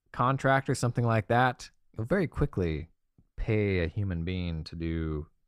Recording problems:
none

